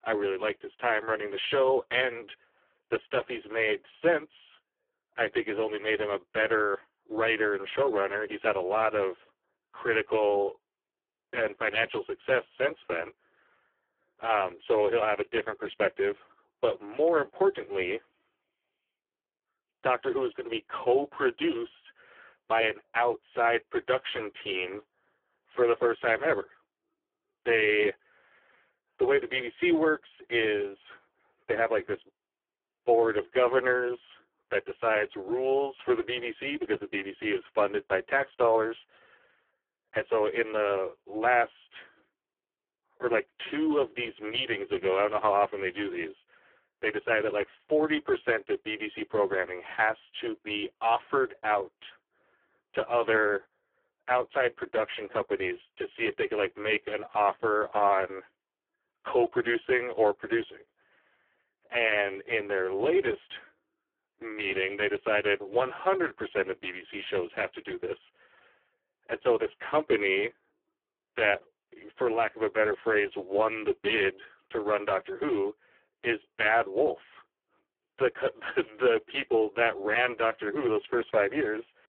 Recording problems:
phone-call audio; poor line

